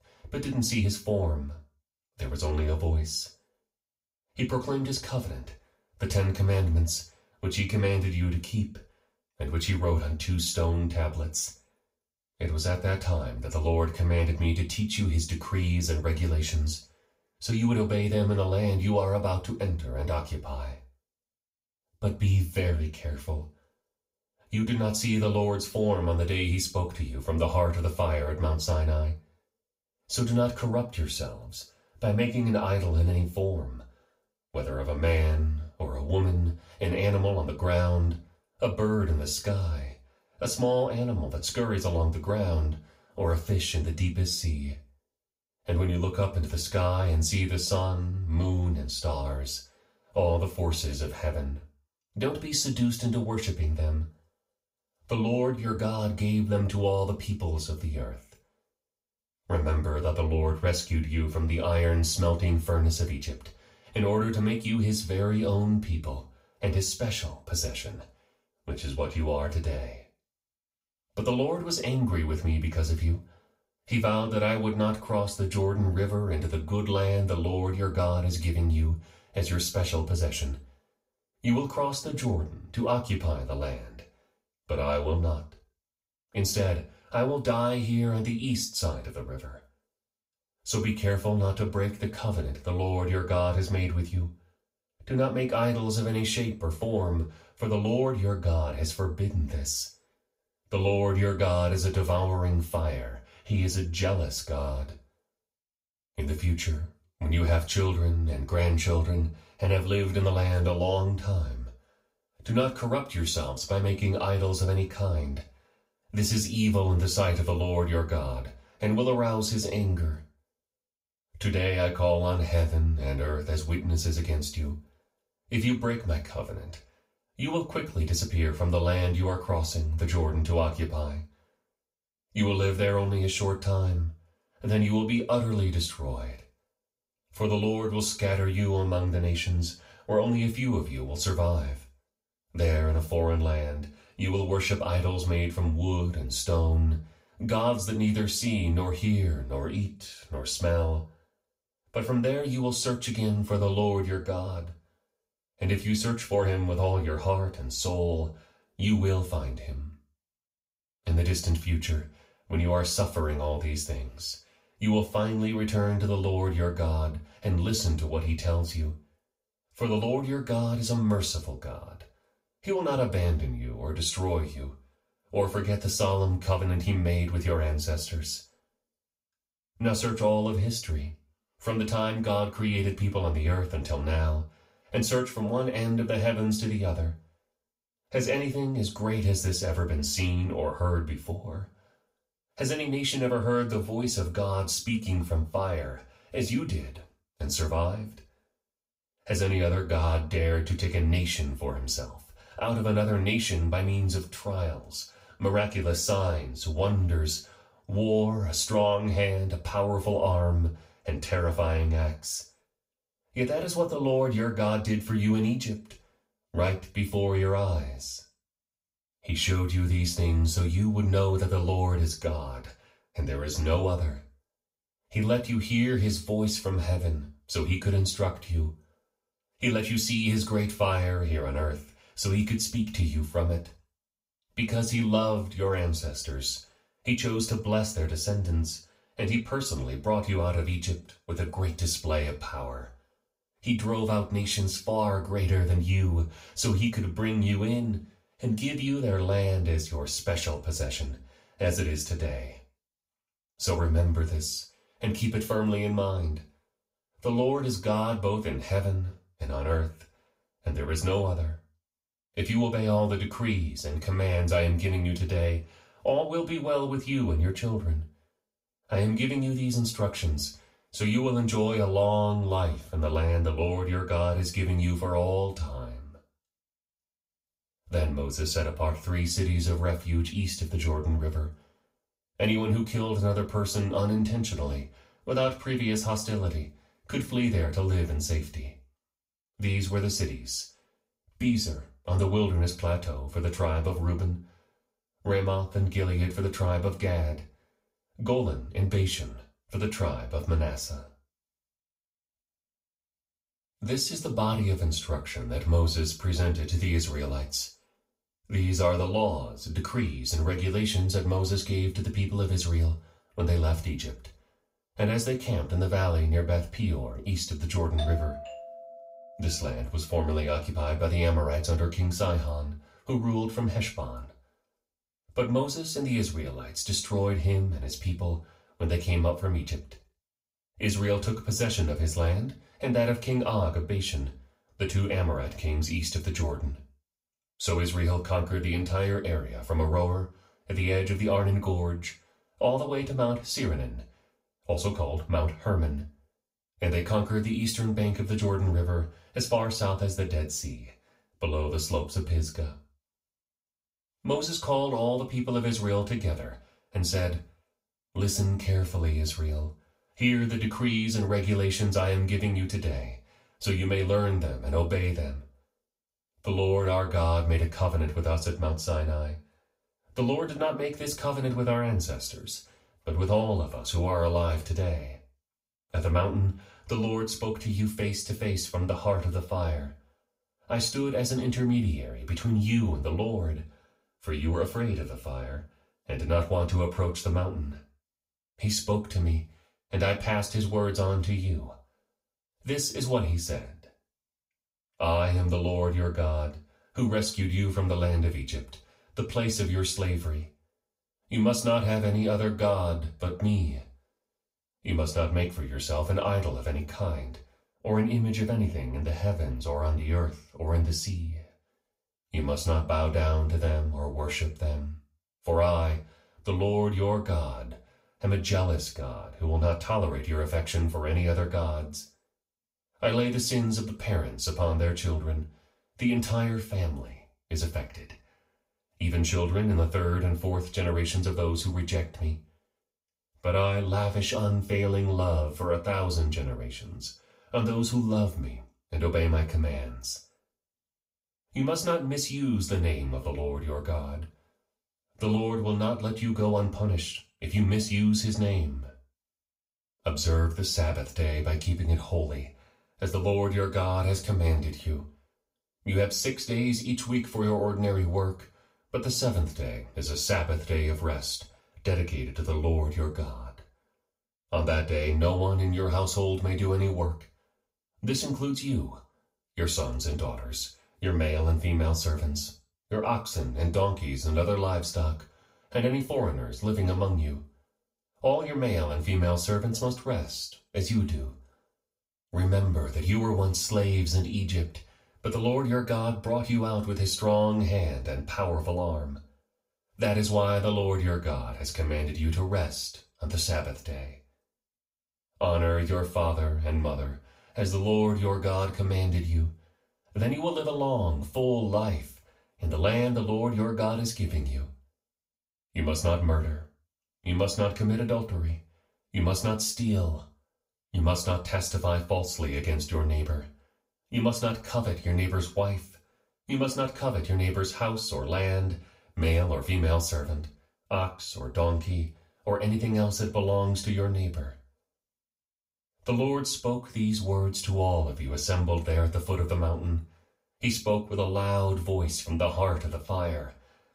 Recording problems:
off-mic speech; far
room echo; slight; dies away in 0.3 s
doorbell; noticeable; from 5:18 to 5:19; peak 8 dB below the speech

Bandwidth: 15.5 kHz